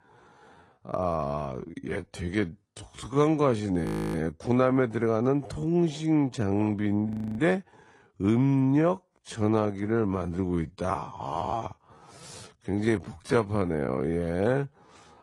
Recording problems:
wrong speed, natural pitch; too slow; 0.6 times normal speed
garbled, watery; slightly; nothing above 15 kHz
audio freezing; at 4 s and at 7 s

